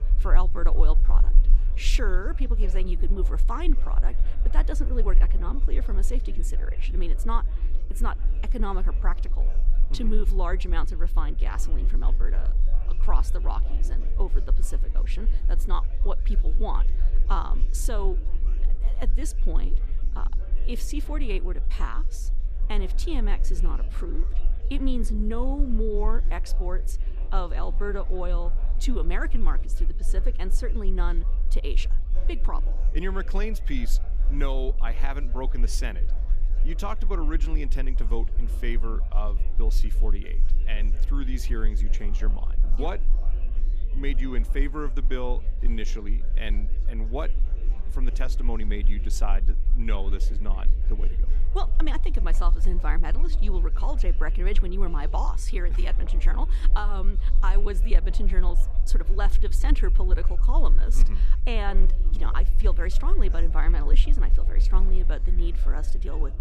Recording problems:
chatter from many people; noticeable; throughout; 15 dB below the speech
low rumble; noticeable; throughout; 15 dB below the speech

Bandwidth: 15 kHz